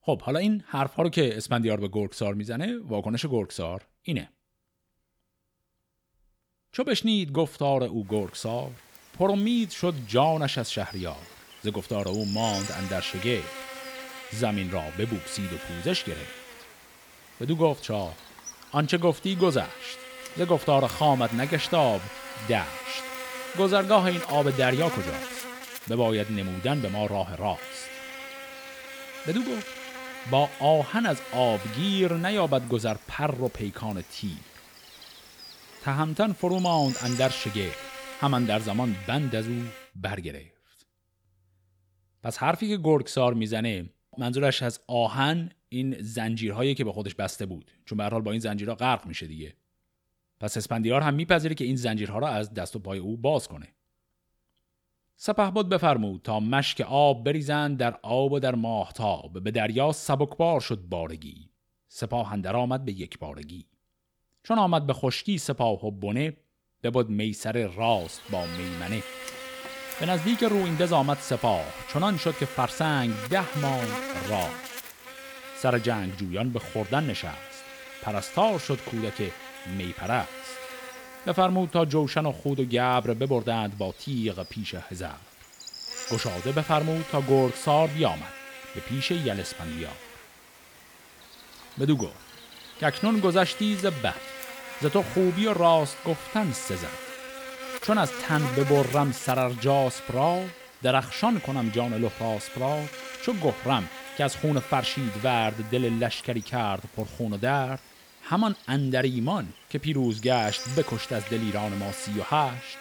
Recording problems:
electrical hum; noticeable; from 8 to 40 s and from 1:08 on; 50 Hz, 10 dB below the speech

